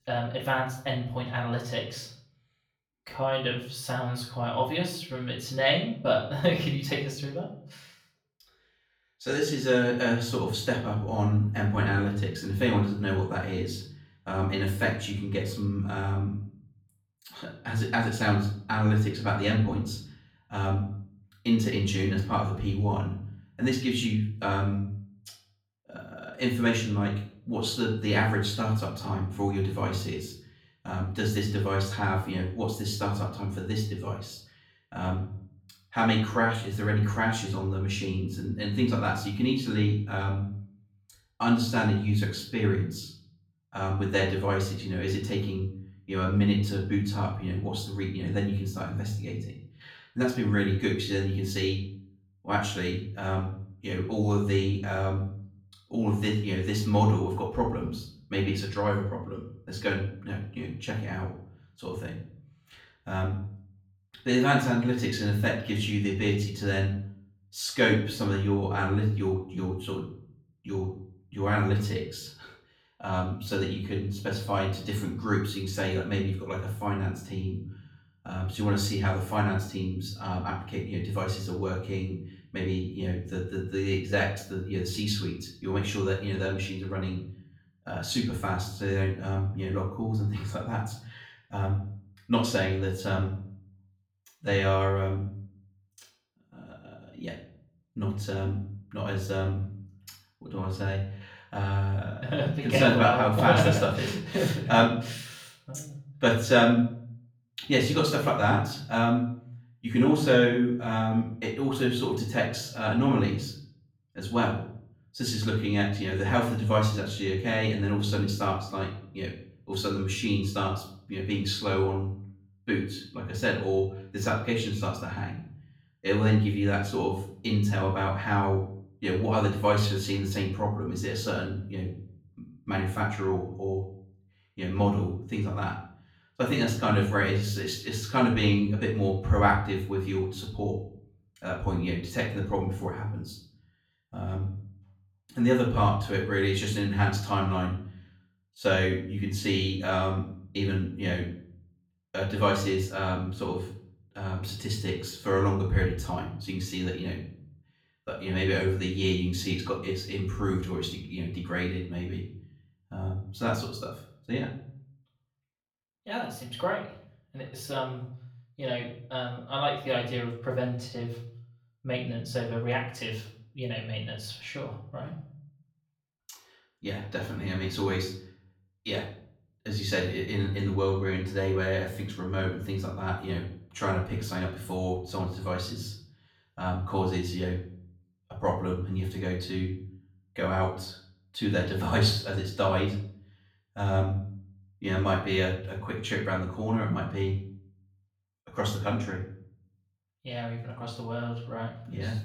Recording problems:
off-mic speech; far
room echo; slight; dies away in 0.5 s

